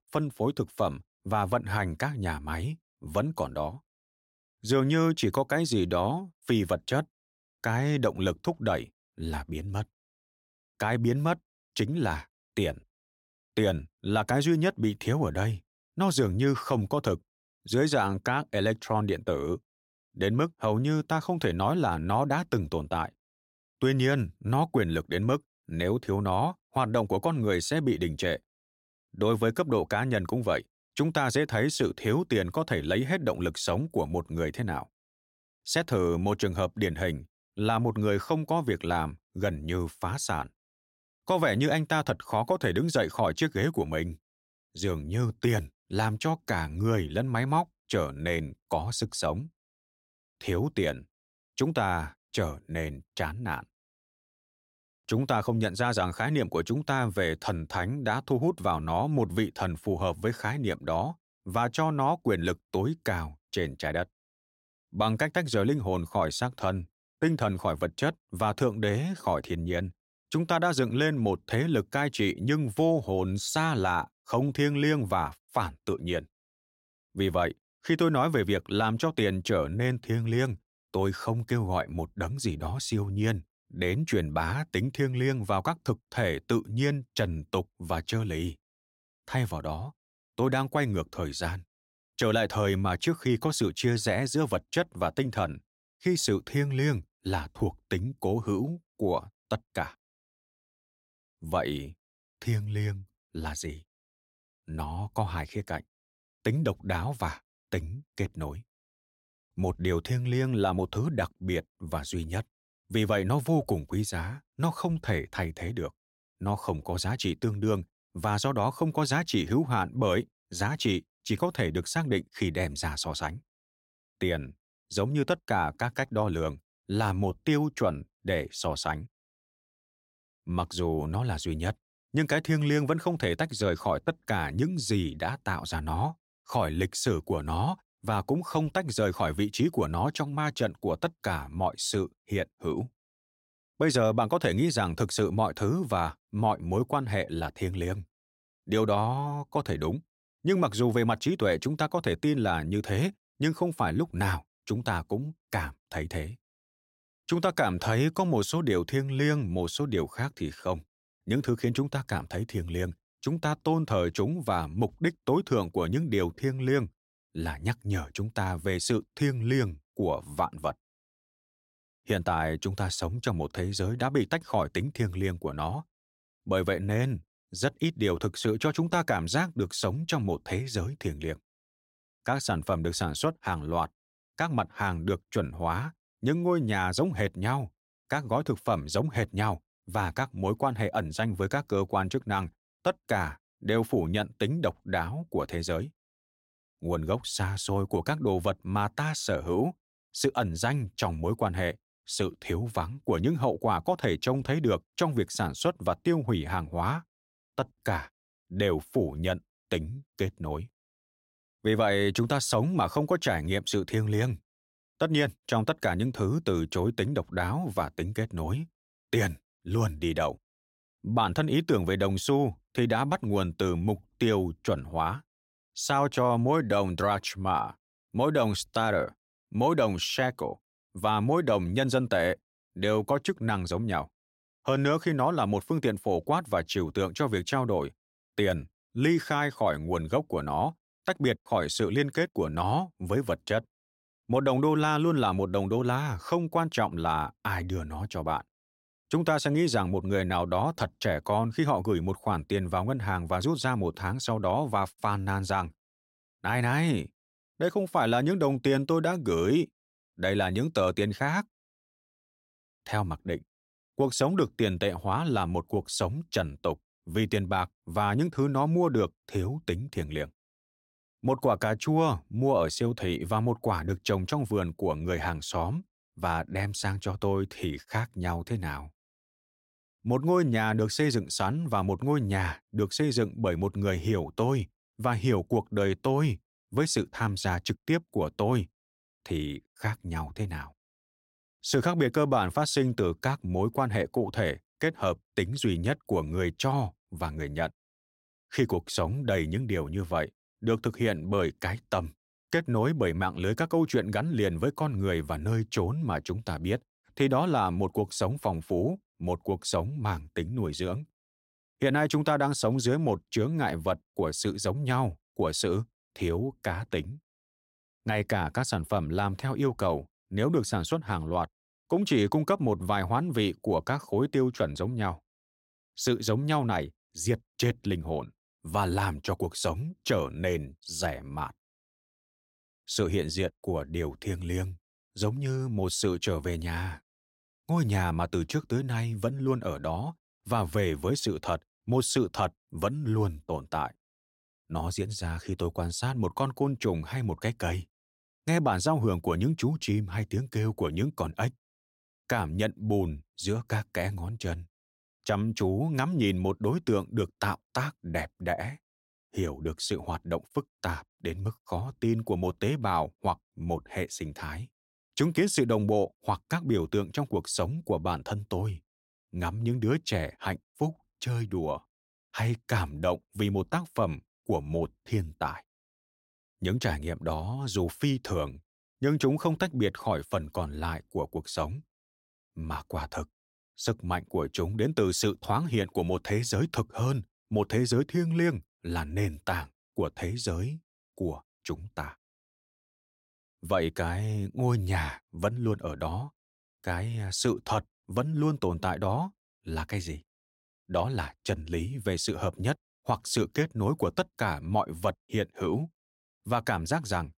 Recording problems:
none

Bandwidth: 16 kHz